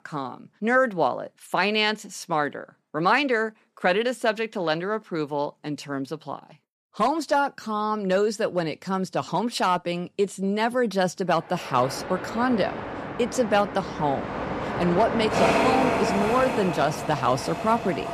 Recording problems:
train or aircraft noise; loud; from 12 s on; 3 dB below the speech

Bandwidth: 14.5 kHz